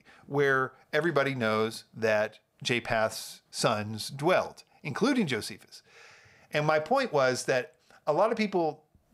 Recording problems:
none

